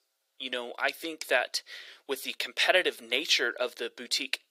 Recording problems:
thin; very; fading below 450 Hz

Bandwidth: 15.5 kHz